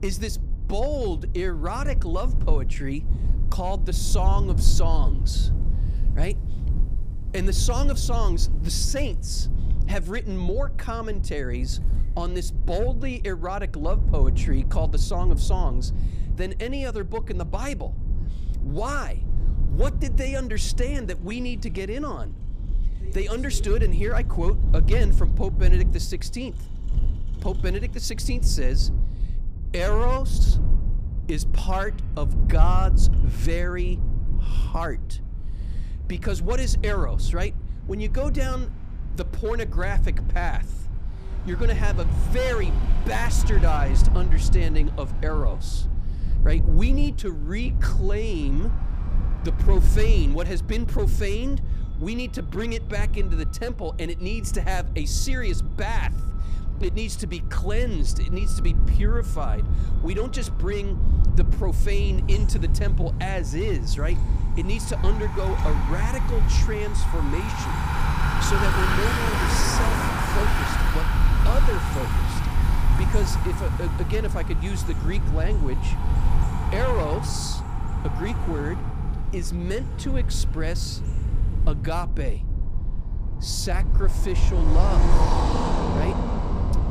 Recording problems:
traffic noise; very loud; throughout; as loud as the speech
low rumble; noticeable; throughout; 10 dB below the speech

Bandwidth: 15 kHz